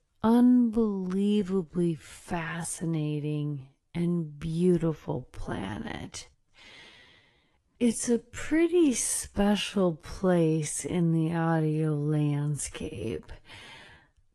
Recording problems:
wrong speed, natural pitch; too slow; 0.5 times normal speed
garbled, watery; slightly

